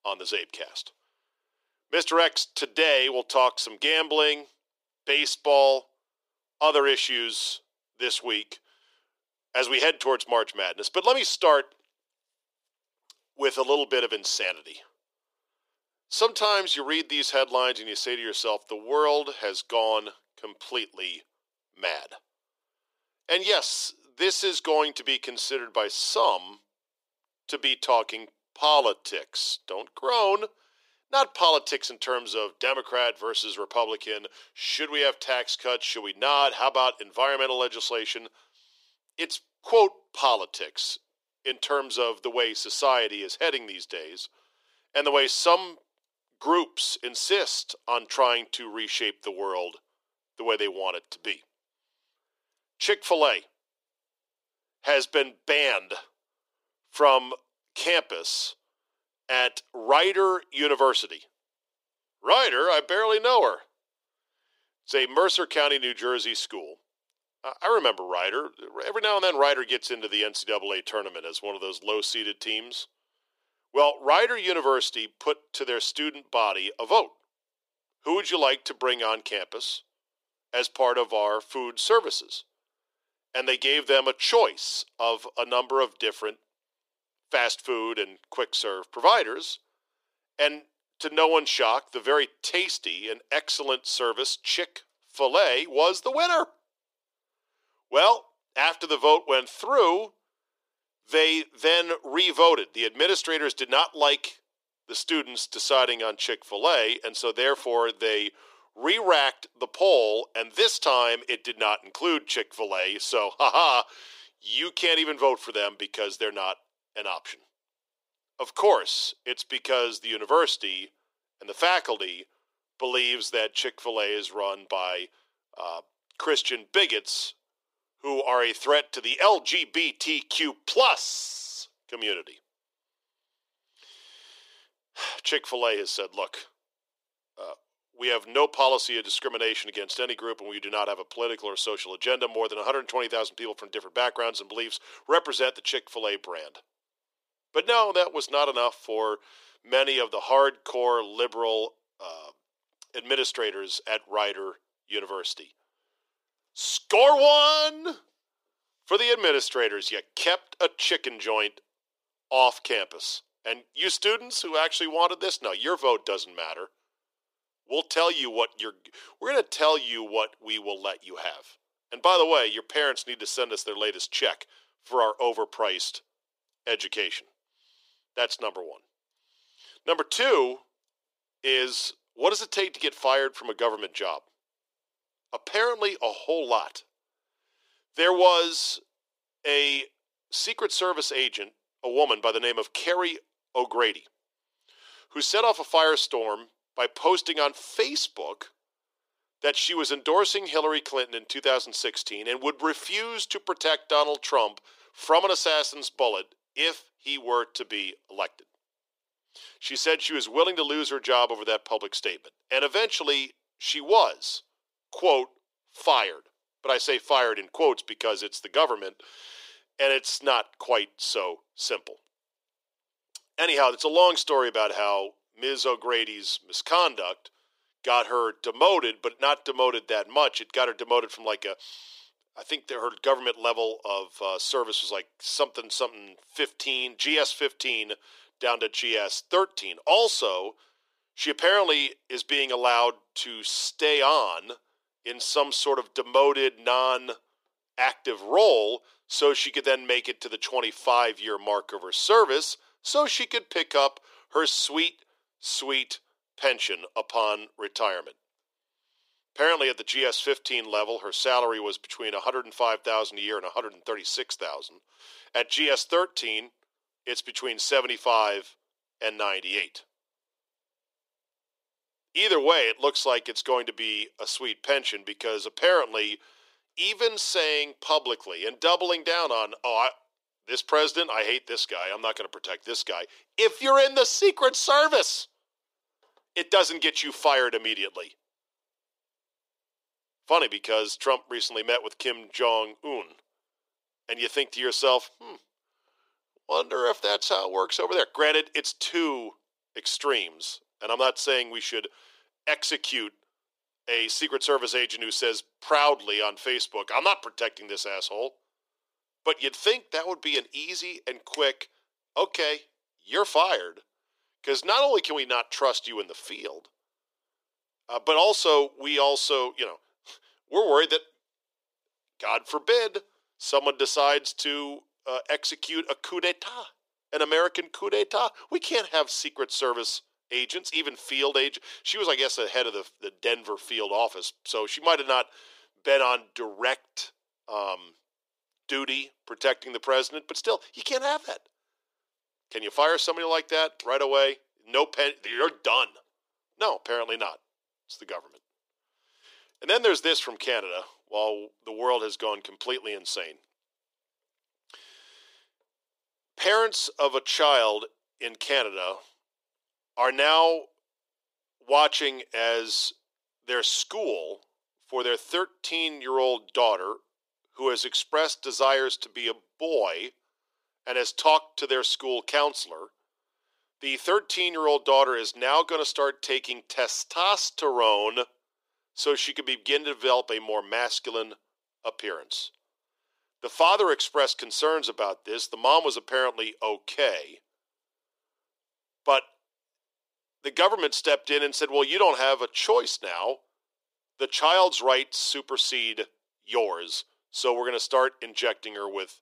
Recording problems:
thin; very; fading below 350 Hz

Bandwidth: 15.5 kHz